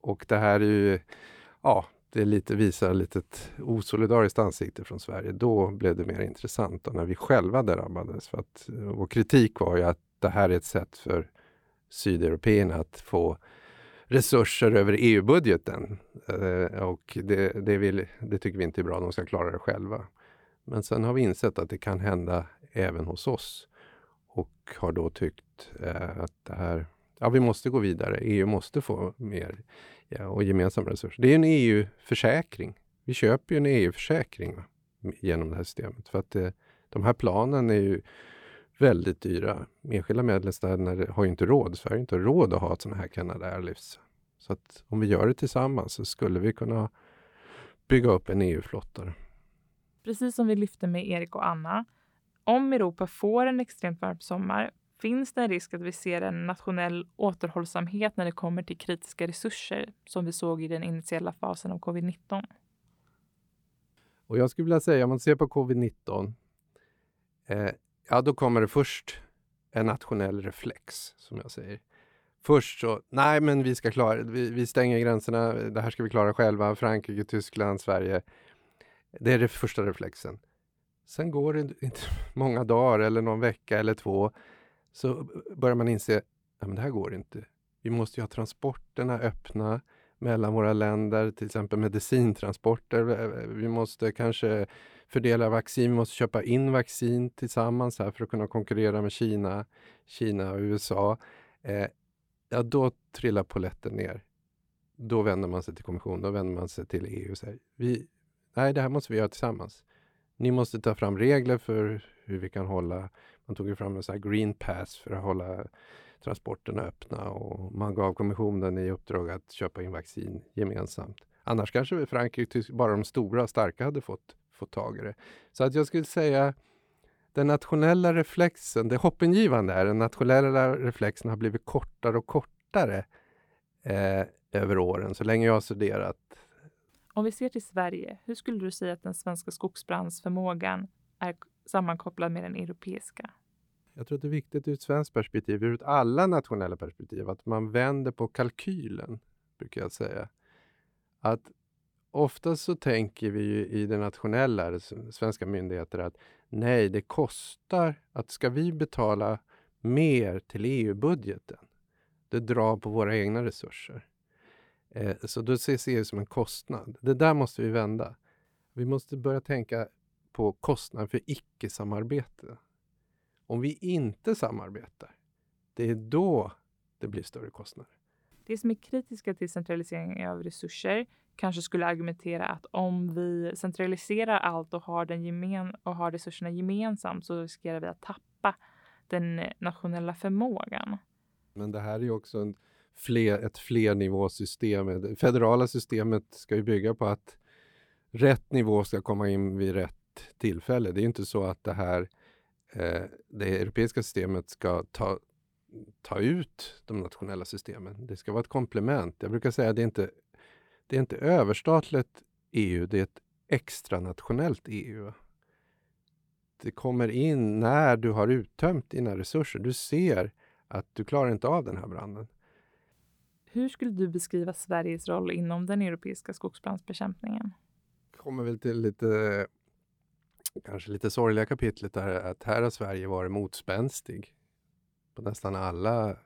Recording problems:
none

